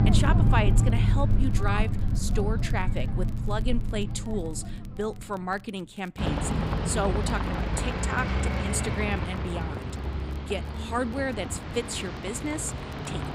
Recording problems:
traffic noise; very loud; throughout; 4 dB above the speech
crackle, like an old record; faint; 25 dB below the speech

